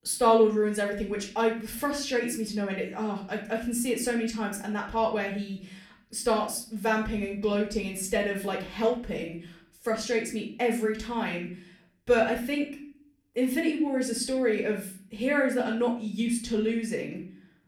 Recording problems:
off-mic speech; far
room echo; slight; dies away in 0.5 s

